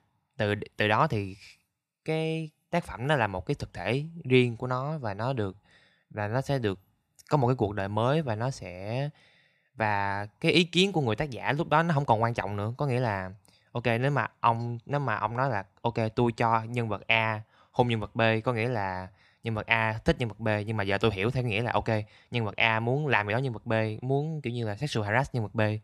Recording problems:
none

